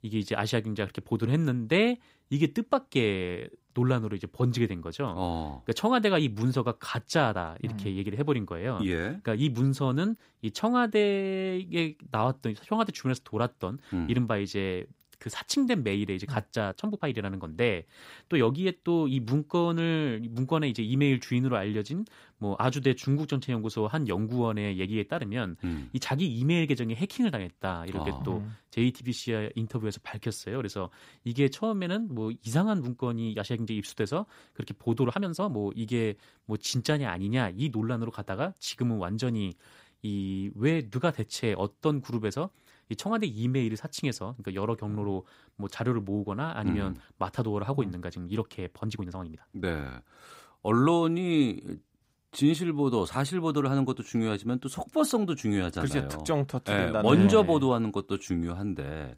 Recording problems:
uneven, jittery; strongly; from 17 to 50 s

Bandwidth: 15.5 kHz